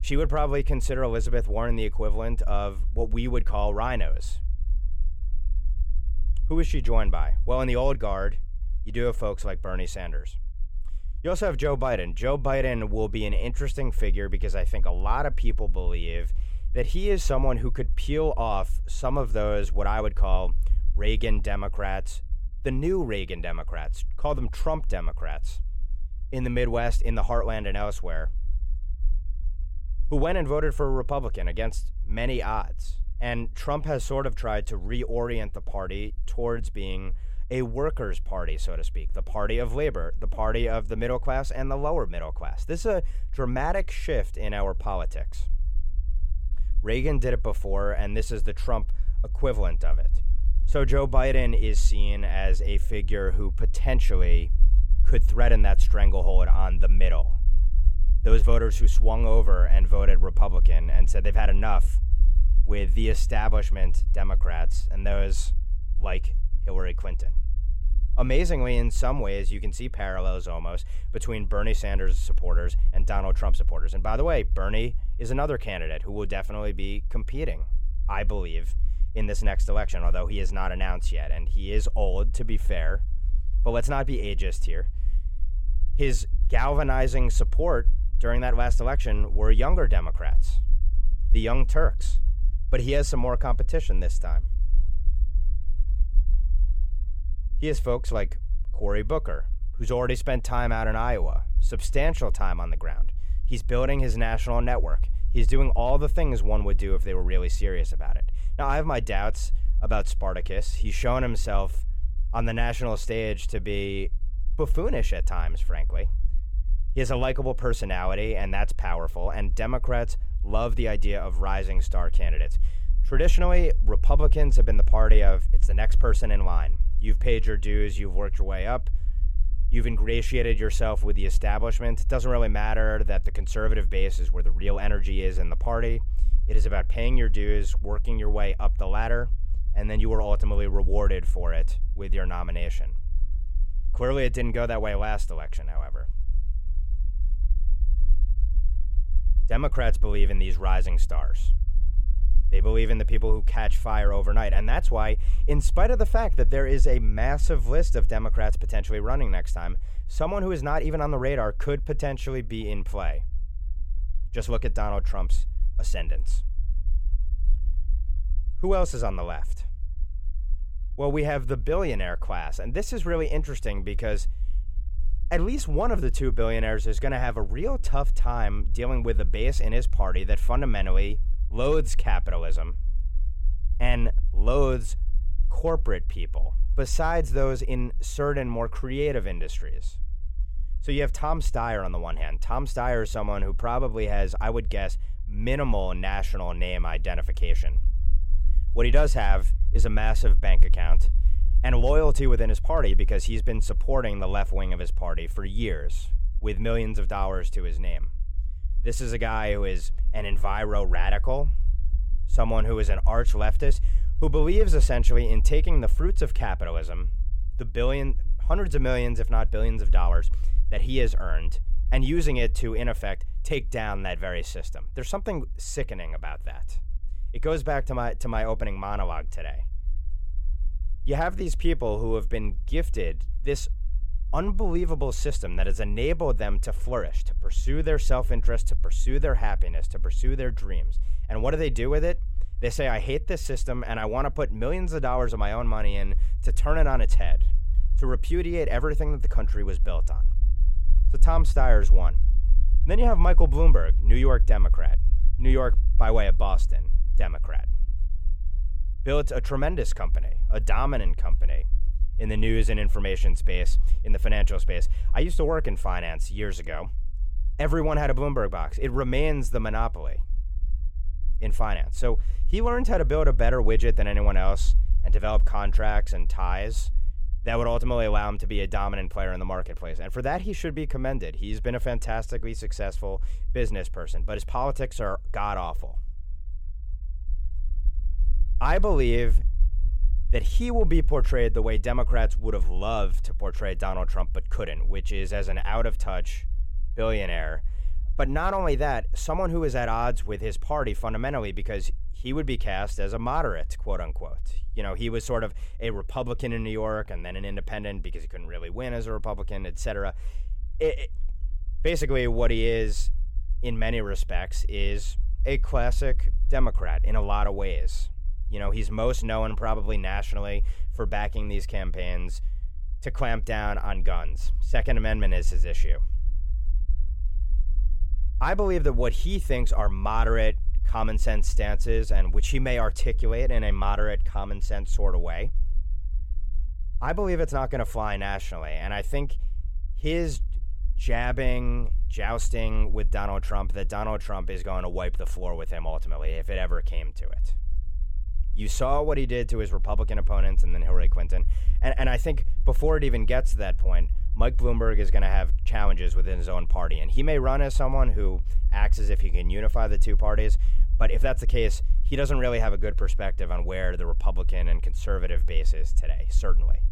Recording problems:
low rumble; faint; throughout; 25 dB below the speech

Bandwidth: 16 kHz